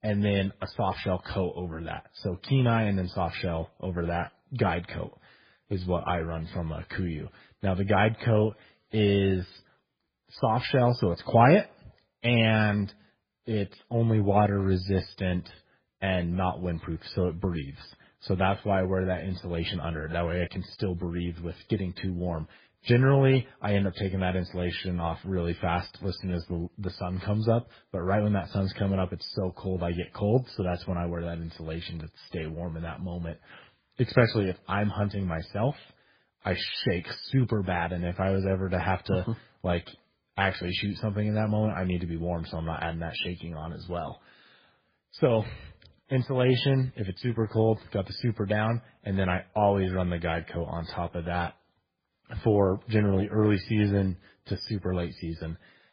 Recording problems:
garbled, watery; badly; nothing above 5 kHz

